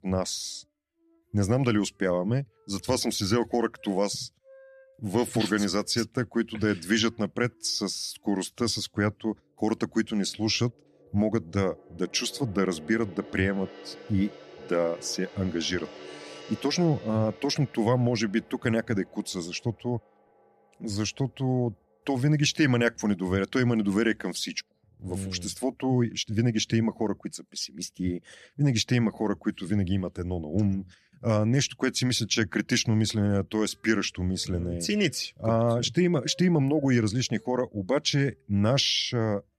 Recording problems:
background music; faint; throughout; 20 dB below the speech

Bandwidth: 13.5 kHz